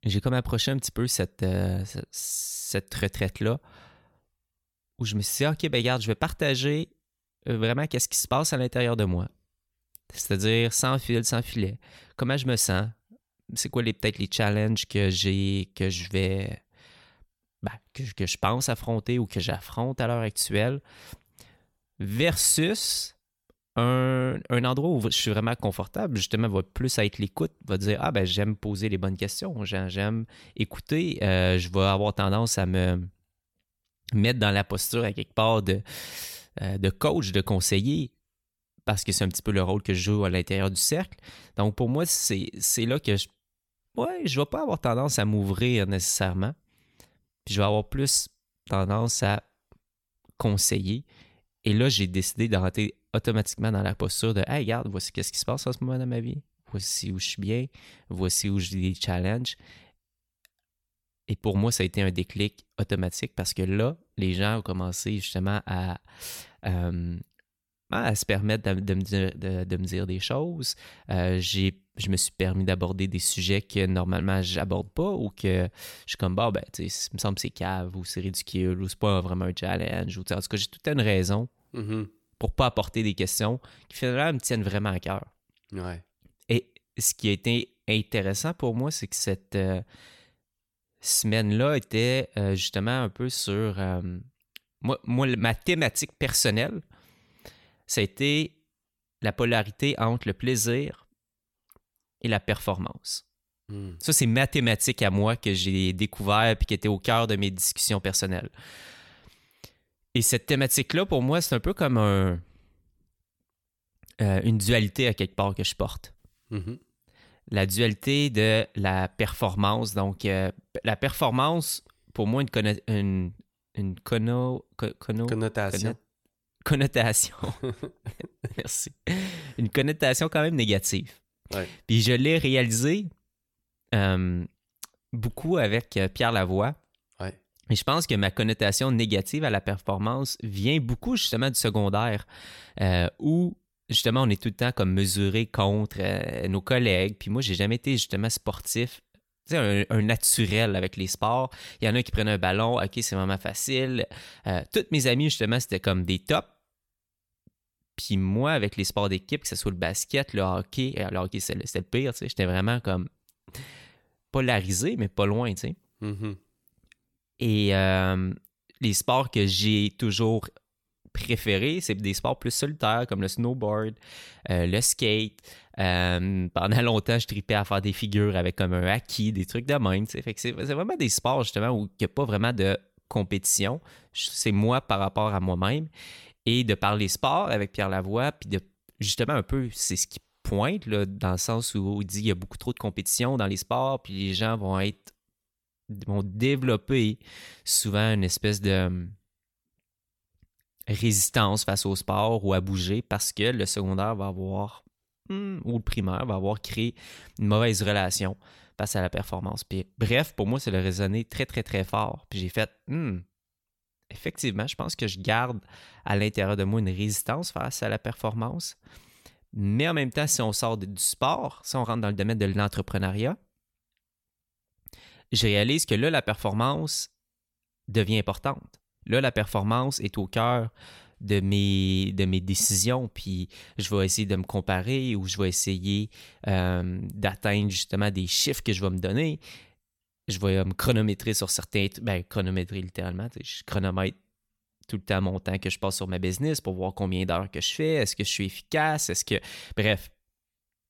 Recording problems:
uneven, jittery; strongly; from 7.5 s to 3:42

